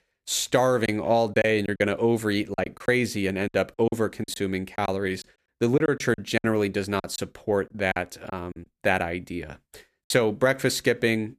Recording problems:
choppy; very; 9% of the speech affected

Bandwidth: 14.5 kHz